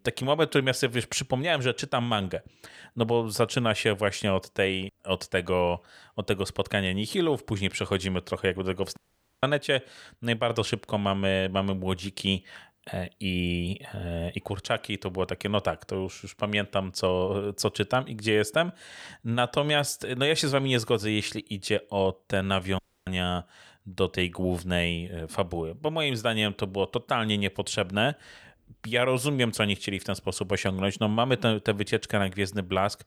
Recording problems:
audio cutting out; at 9 s and at 23 s

